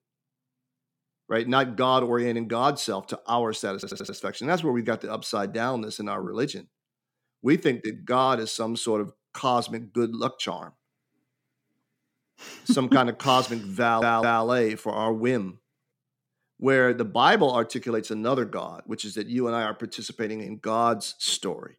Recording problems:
audio stuttering; at 3.5 s and at 14 s

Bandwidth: 17 kHz